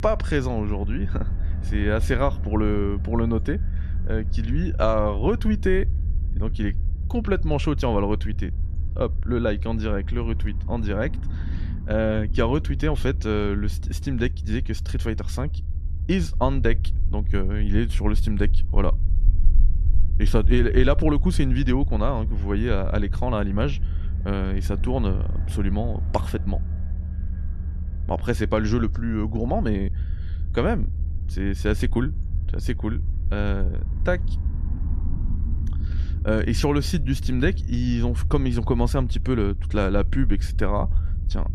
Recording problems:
low rumble; noticeable; throughout; 15 dB below the speech

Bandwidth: 13.5 kHz